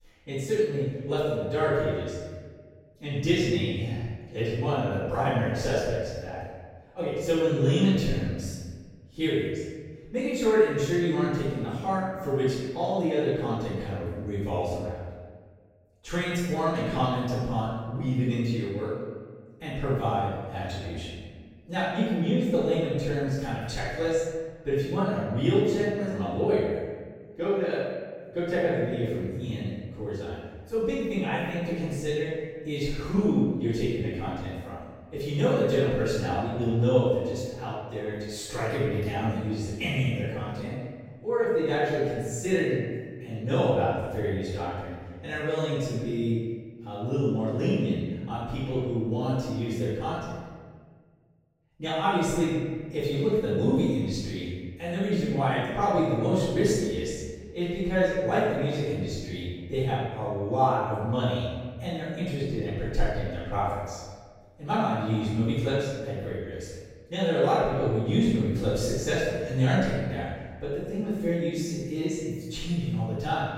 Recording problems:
room echo; strong; dies away in 1.4 s
off-mic speech; far

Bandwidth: 16 kHz